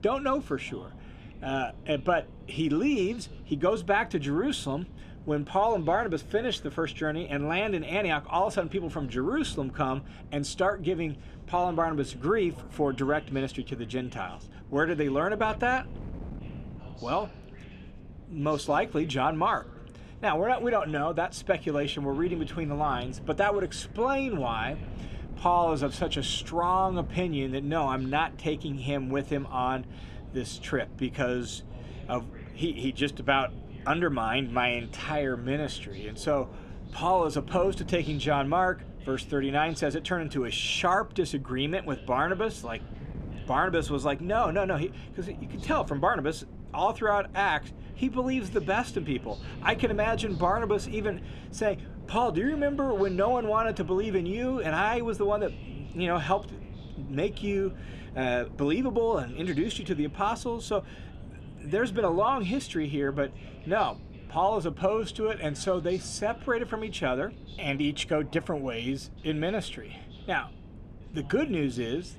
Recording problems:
wind noise on the microphone; occasional gusts; 25 dB below the speech
voice in the background; faint; throughout; 25 dB below the speech

